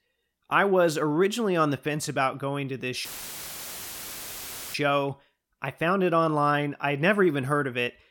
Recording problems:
audio cutting out; filled with static; at 3 s for 1.5 s

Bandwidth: 17 kHz